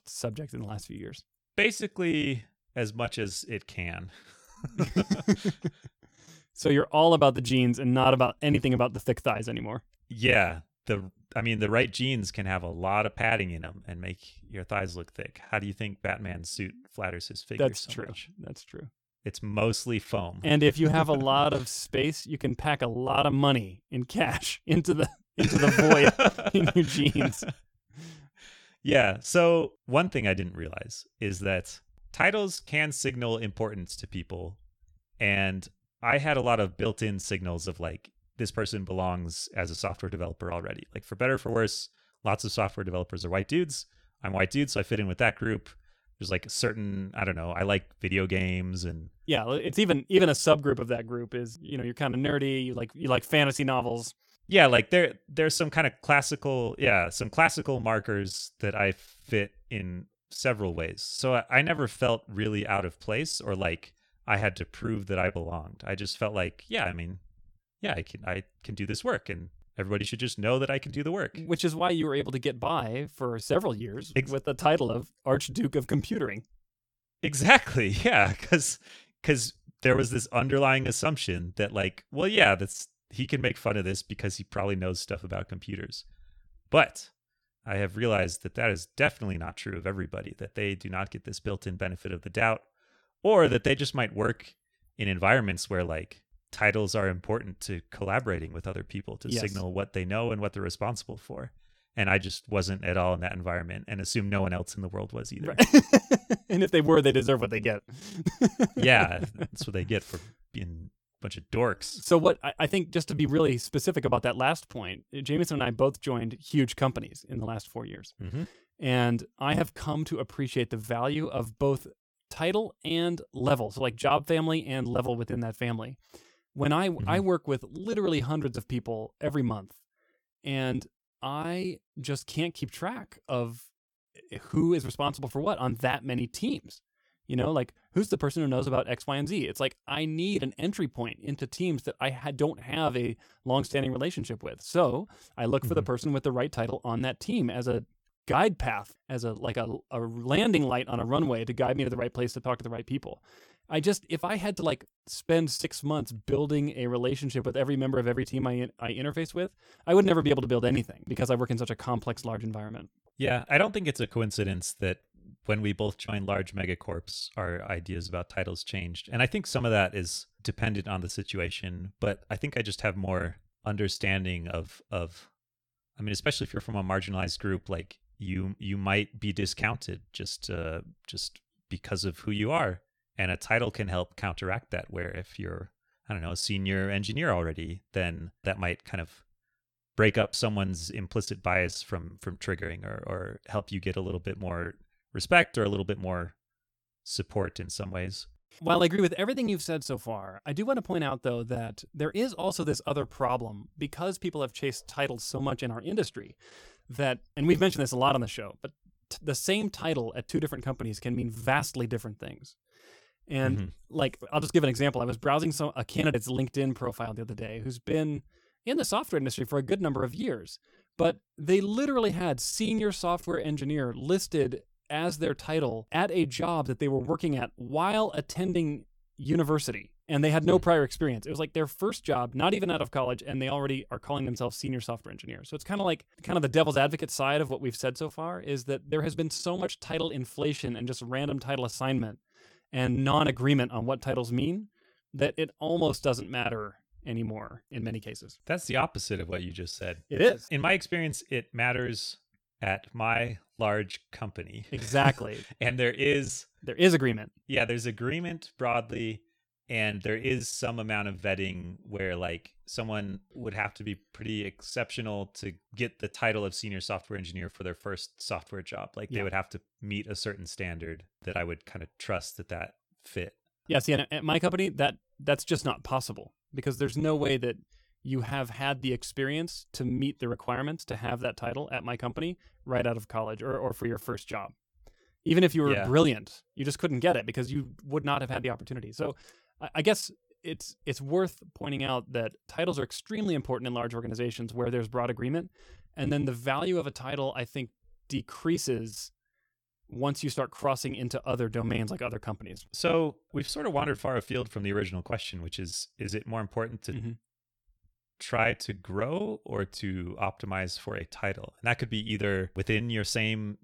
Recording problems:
choppy; very; 6% of the speech affected

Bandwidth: 18 kHz